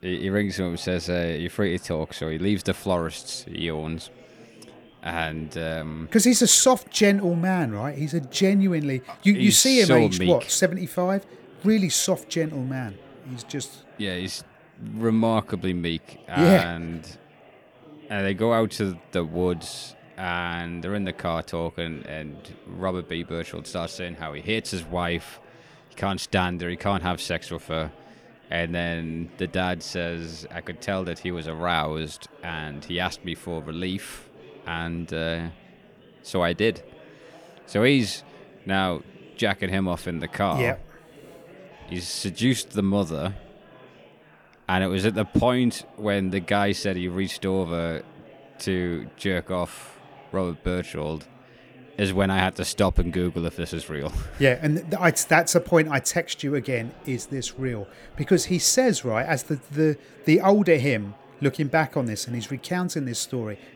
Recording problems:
chatter from many people; faint; throughout; 25 dB below the speech

